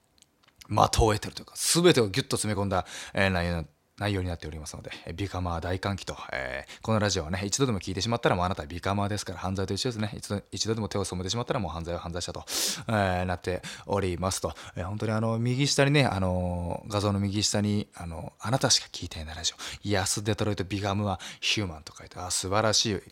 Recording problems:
none

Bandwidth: 16 kHz